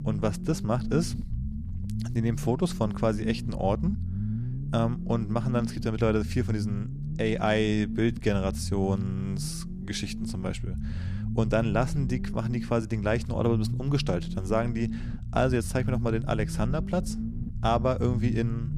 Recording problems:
low rumble; noticeable; throughout; 10 dB below the speech

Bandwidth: 14.5 kHz